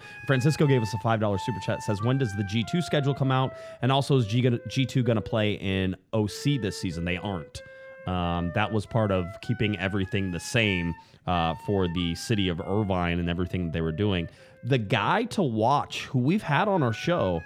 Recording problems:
background music; noticeable; throughout; 15 dB below the speech

